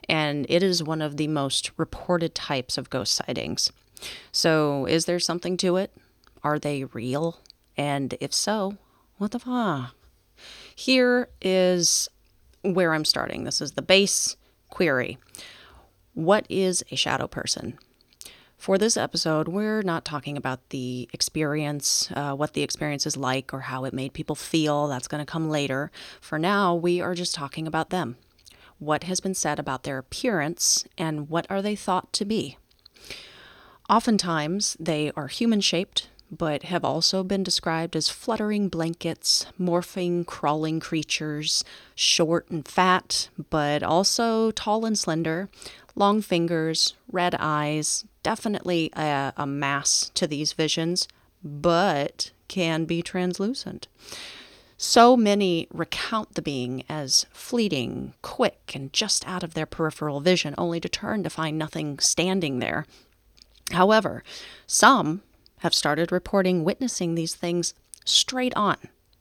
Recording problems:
none

